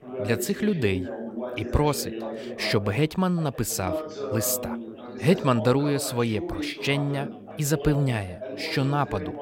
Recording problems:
background chatter; loud; throughout; 3 voices, 9 dB below the speech

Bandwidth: 16 kHz